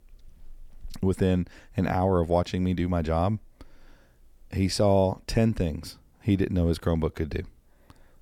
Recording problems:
none

